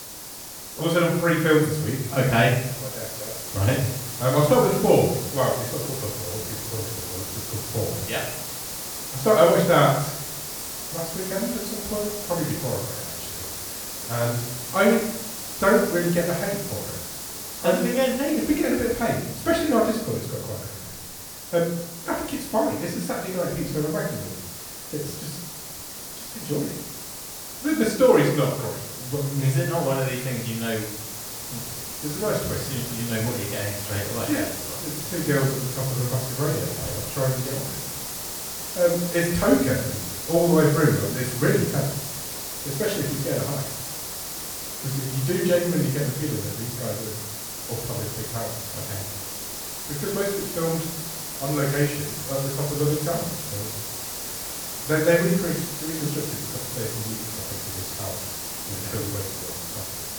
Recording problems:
off-mic speech; far
room echo; noticeable; dies away in 0.7 s
hiss; loud; throughout; 6 dB below the speech

